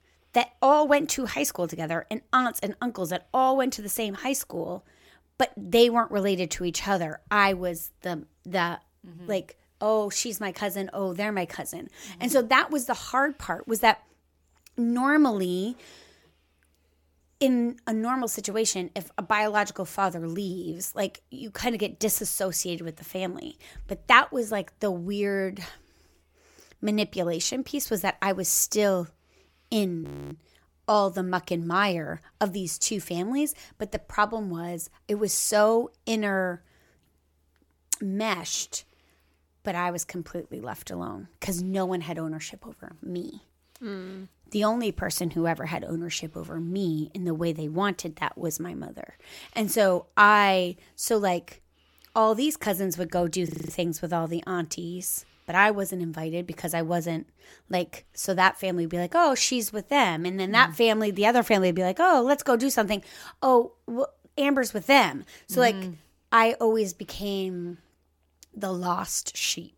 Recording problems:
audio freezing; at 30 s and at 53 s

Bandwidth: 17.5 kHz